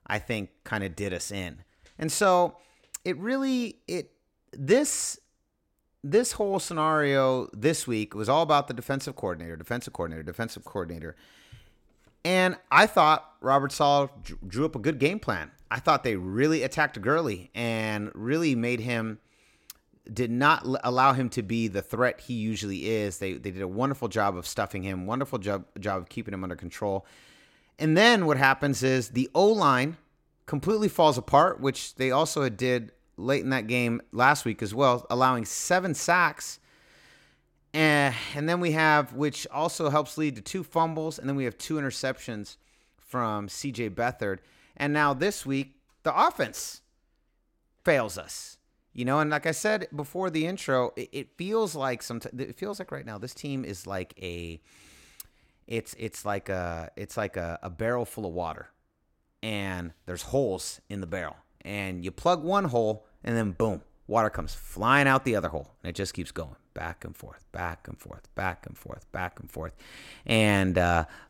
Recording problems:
none

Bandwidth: 16.5 kHz